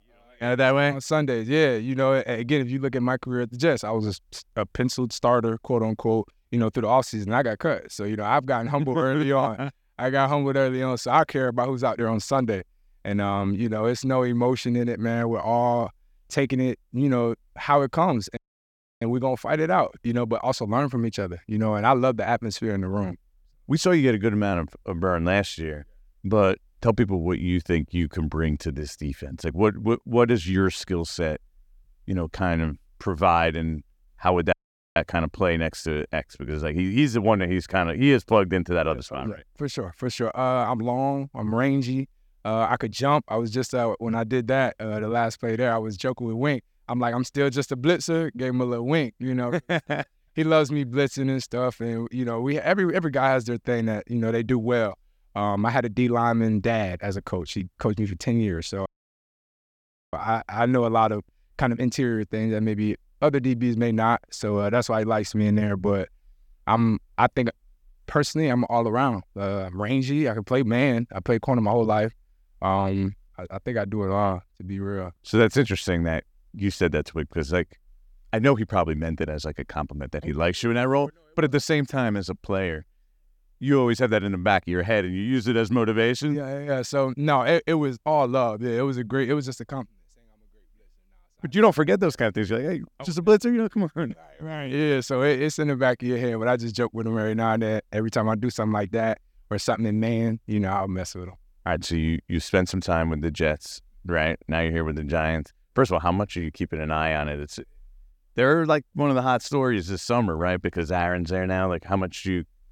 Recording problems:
audio cutting out; at 18 s for 0.5 s, at 35 s and at 59 s for 1.5 s

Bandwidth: 17.5 kHz